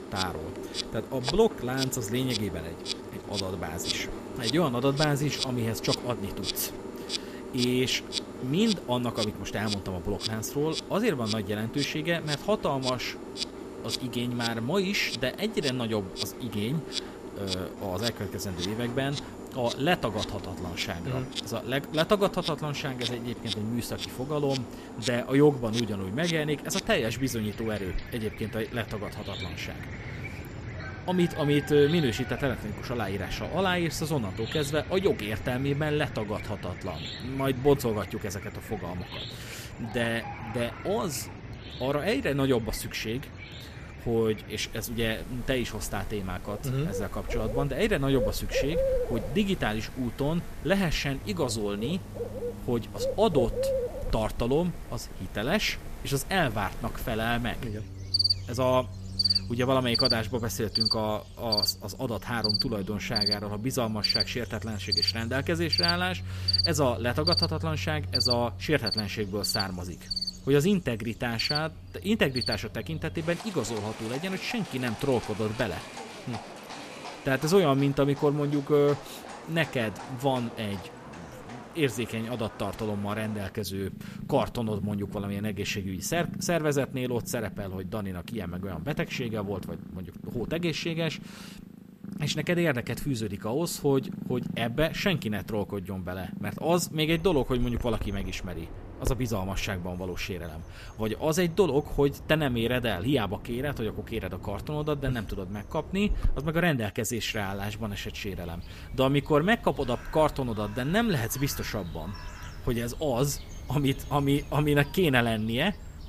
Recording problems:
animal sounds; loud; throughout; 6 dB below the speech

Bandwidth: 14.5 kHz